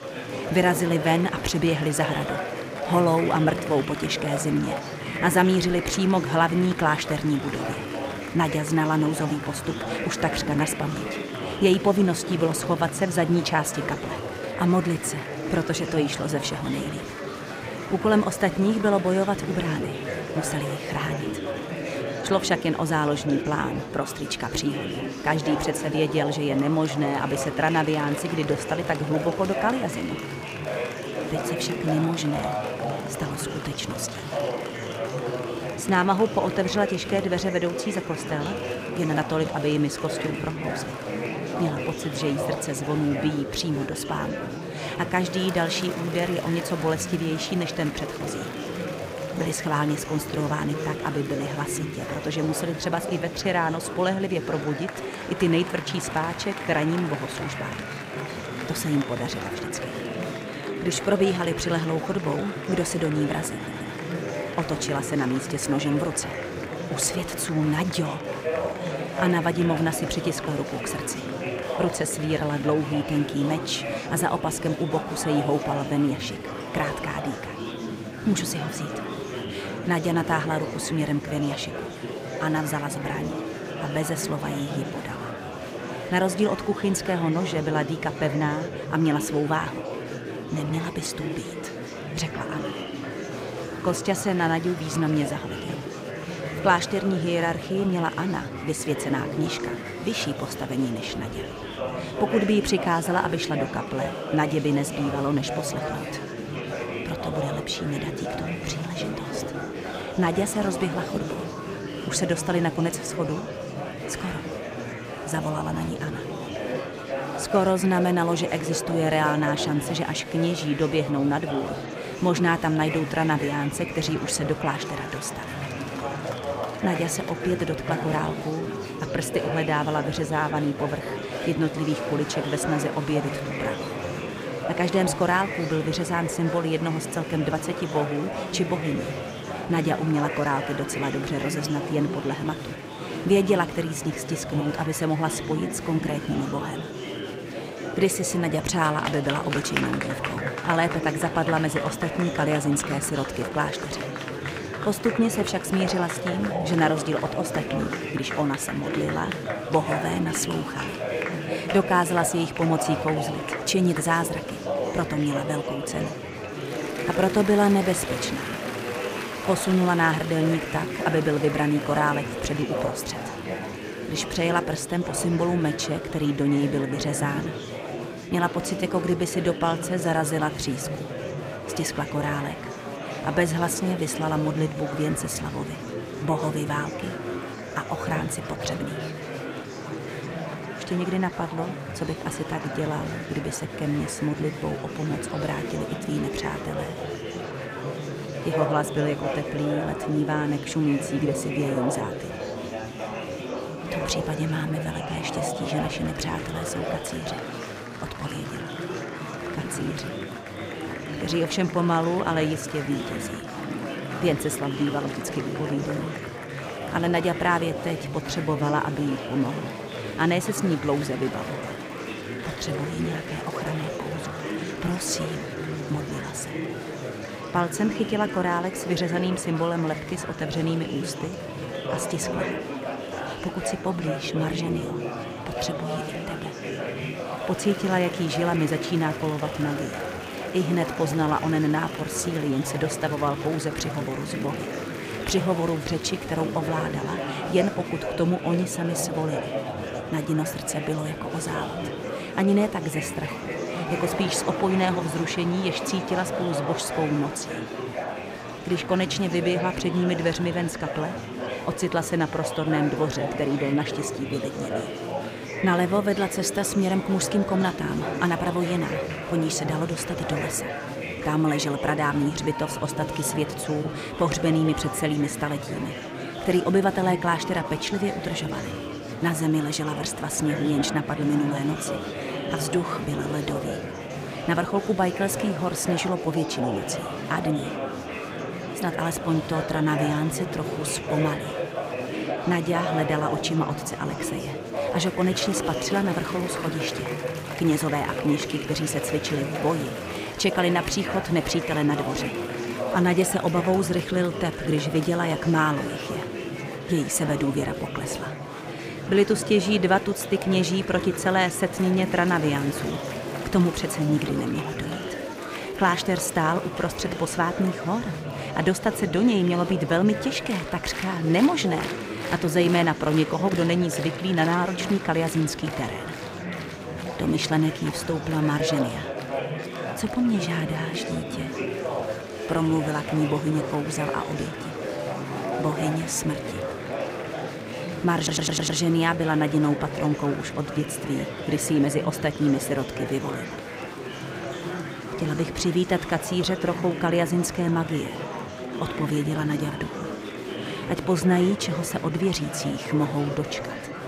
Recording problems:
murmuring crowd; loud; throughout; 6 dB below the speech
audio stuttering; at 1:04 and at 5:38

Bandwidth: 15.5 kHz